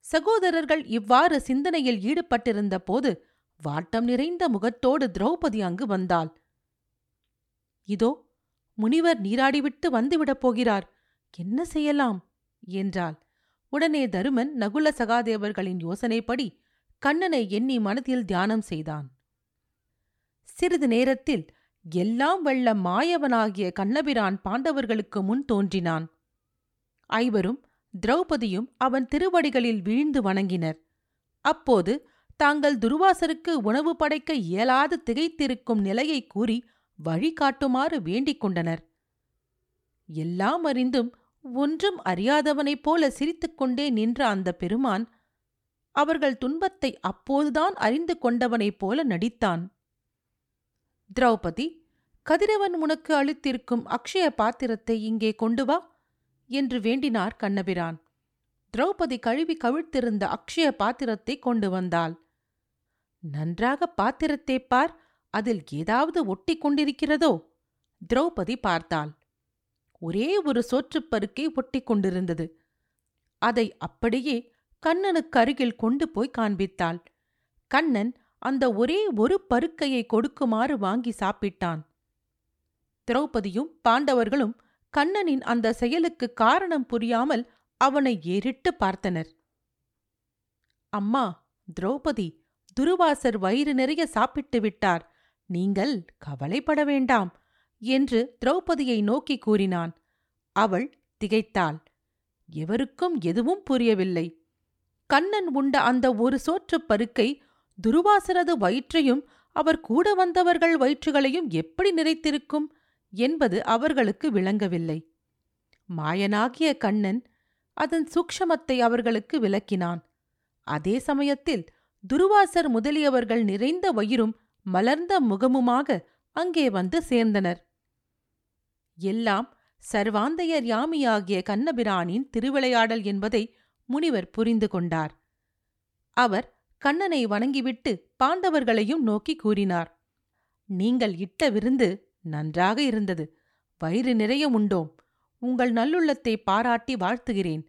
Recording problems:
none

